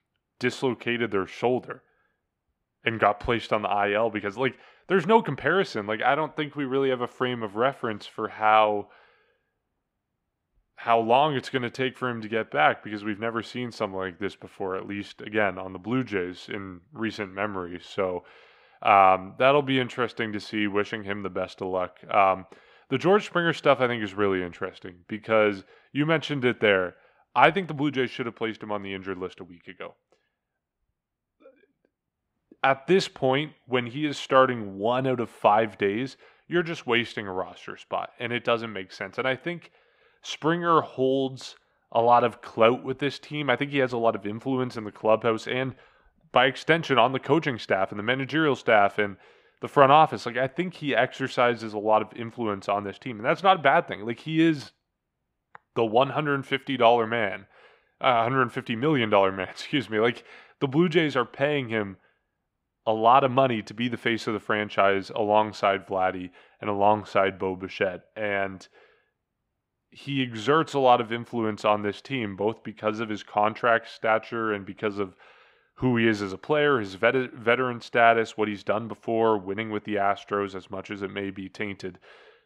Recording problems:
muffled; slightly; fading above 3.5 kHz

